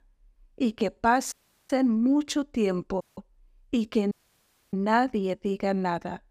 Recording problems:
audio cutting out; at 1.5 s, at 3 s and at 4 s for 0.5 s

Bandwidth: 15 kHz